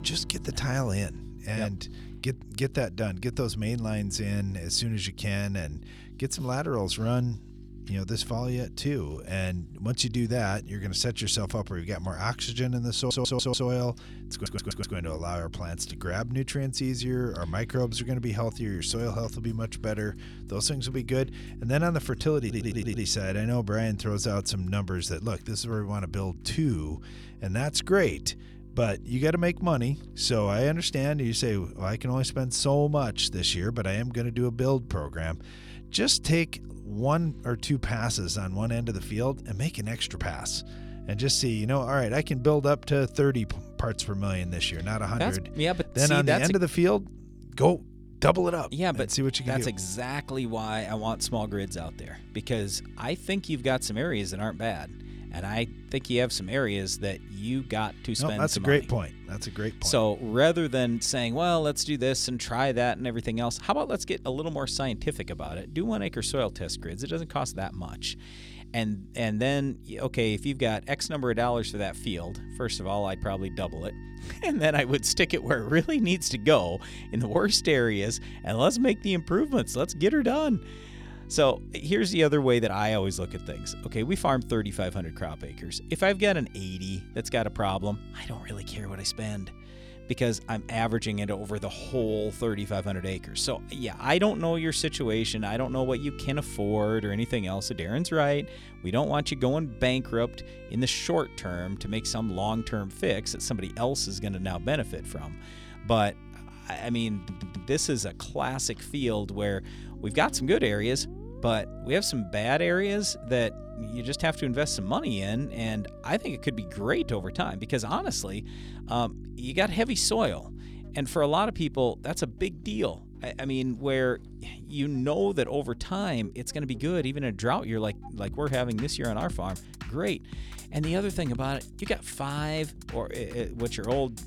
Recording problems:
electrical hum; faint; throughout; 50 Hz, 25 dB below the speech
background music; faint; throughout; 25 dB below the speech
audio stuttering; 4 times, first at 13 s

